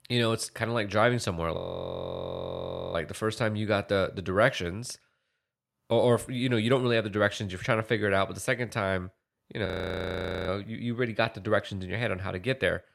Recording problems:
audio freezing; at 1.5 s for 1.5 s and at 9.5 s for 1 s

